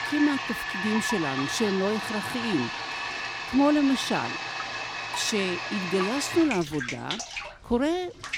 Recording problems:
household noises; loud; throughout; 4 dB below the speech

